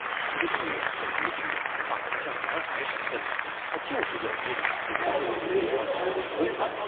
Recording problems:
phone-call audio; poor line; nothing above 3.5 kHz
crowd noise; very loud; throughout; 7 dB above the speech
chatter from many people; noticeable; throughout; 10 dB below the speech

